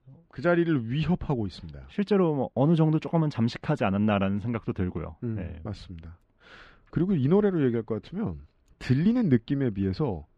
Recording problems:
muffled; very slightly; fading above 3 kHz

